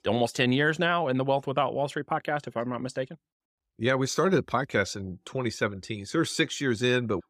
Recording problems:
none

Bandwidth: 15.5 kHz